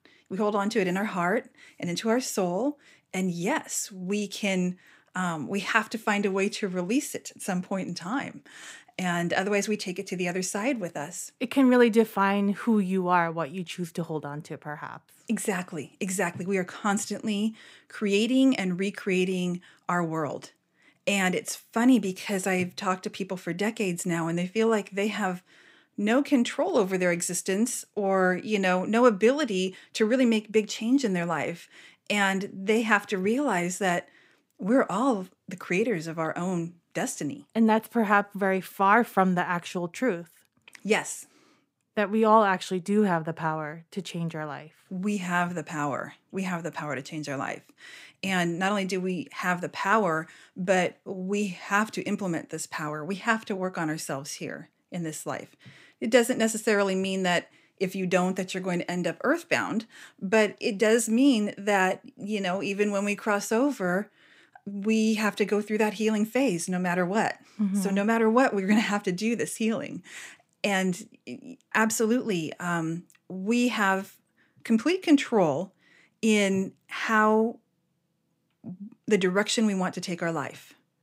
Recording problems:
none

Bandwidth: 15.5 kHz